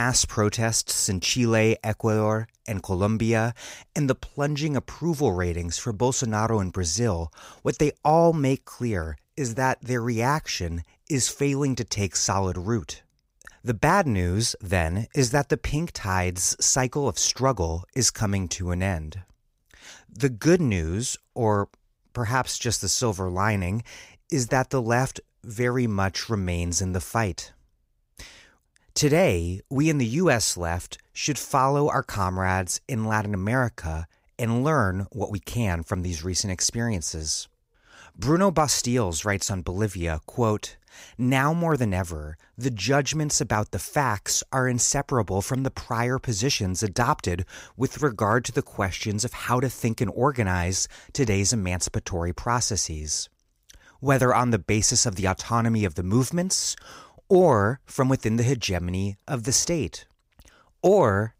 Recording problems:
abrupt cut into speech; at the start

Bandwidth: 15.5 kHz